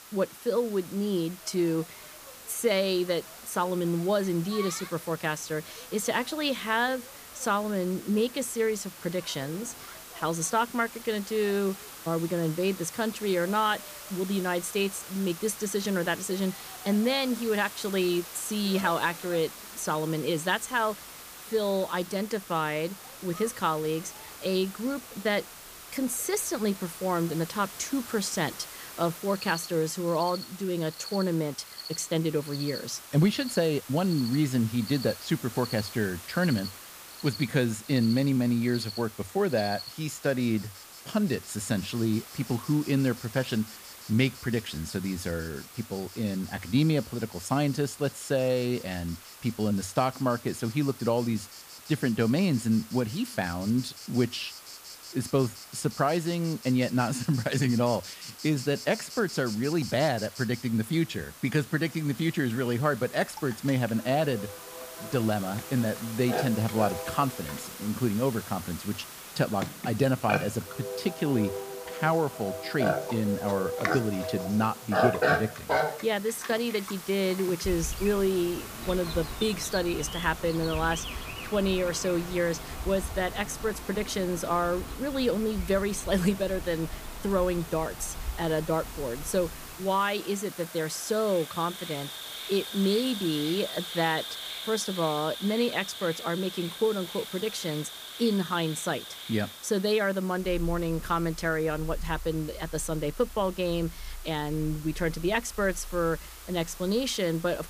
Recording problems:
animal sounds; loud; throughout; 10 dB below the speech
hiss; noticeable; throughout; 15 dB below the speech

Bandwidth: 15 kHz